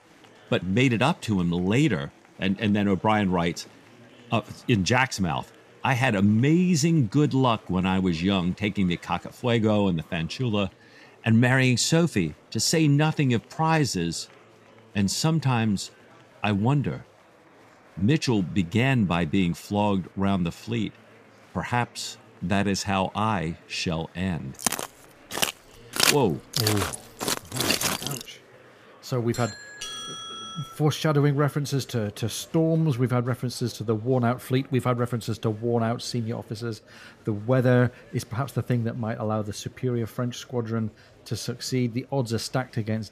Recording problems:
murmuring crowd; faint; throughout; 25 dB below the speech
footsteps; loud; from 25 to 28 s; peak 4 dB above the speech
doorbell; noticeable; from 29 to 31 s; peak 8 dB below the speech

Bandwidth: 14.5 kHz